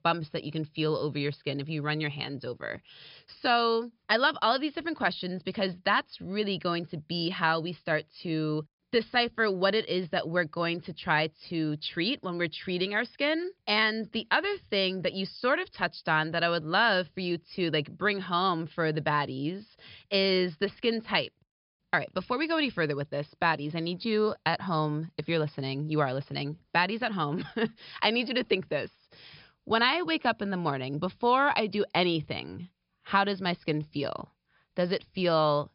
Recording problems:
high frequencies cut off; noticeable; nothing above 5.5 kHz

